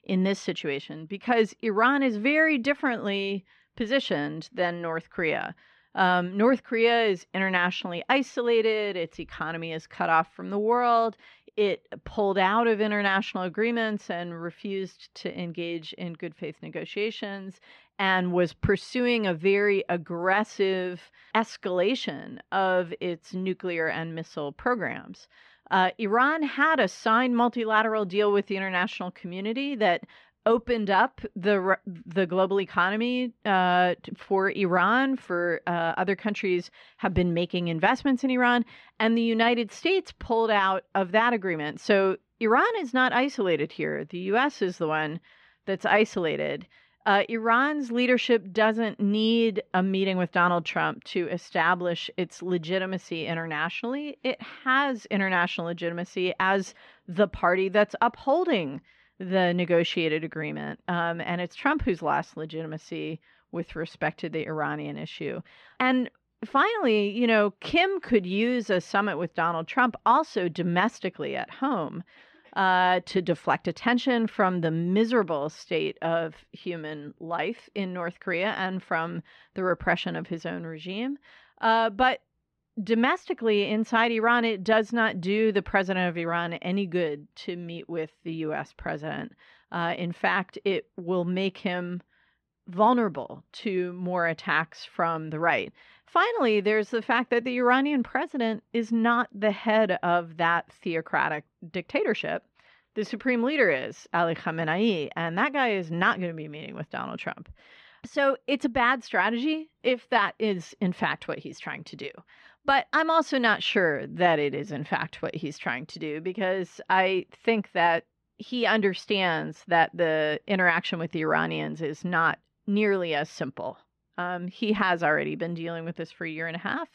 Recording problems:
muffled; slightly; fading above 2.5 kHz

